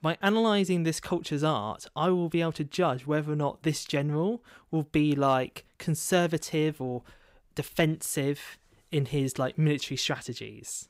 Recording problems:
none

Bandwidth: 15.5 kHz